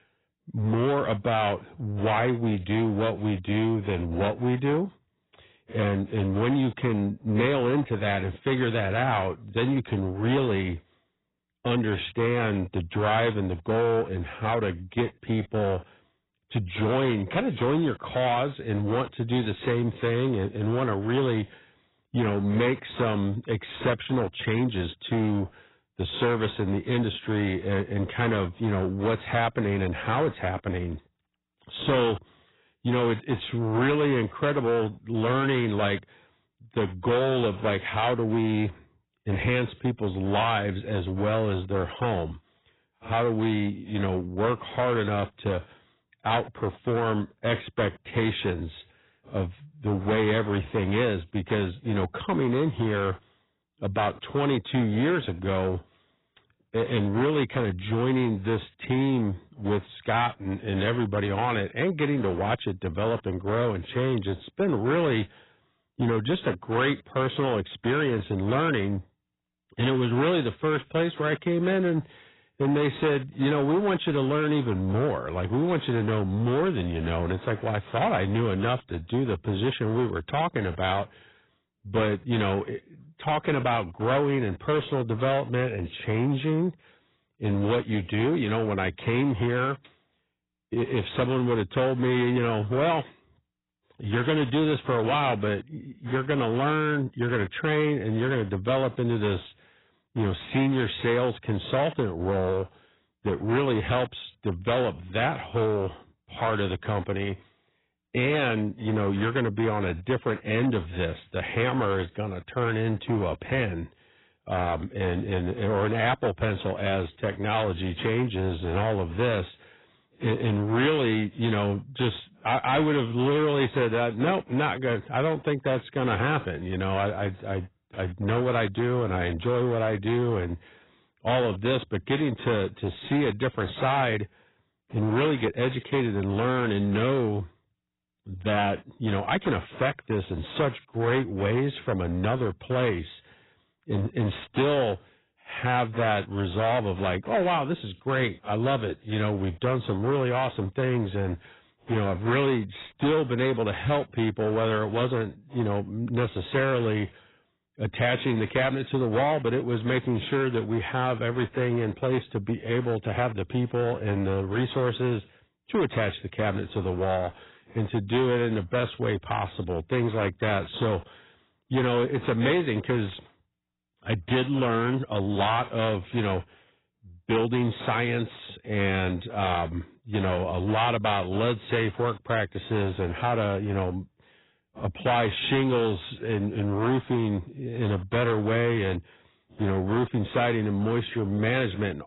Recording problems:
garbled, watery; badly; nothing above 4 kHz
distortion; slight; 11% of the sound clipped

